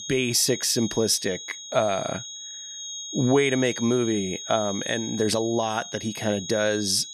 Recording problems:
high-pitched whine; loud; throughout; 6.5 kHz, 9 dB below the speech

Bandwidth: 15 kHz